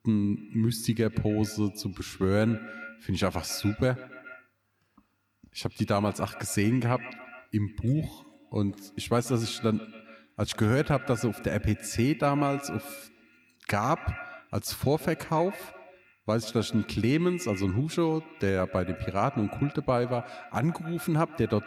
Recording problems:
echo of what is said; noticeable; throughout; 130 ms later, 15 dB below the speech

